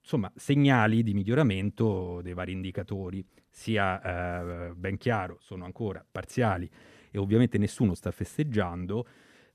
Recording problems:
none

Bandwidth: 14 kHz